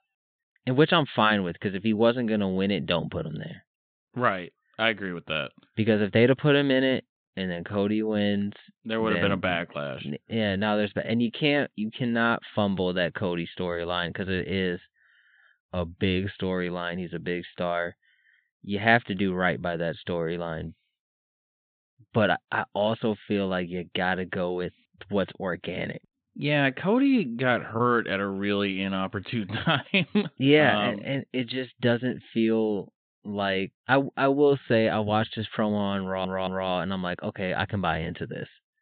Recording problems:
high frequencies cut off; severe; nothing above 4 kHz
audio stuttering; at 36 s

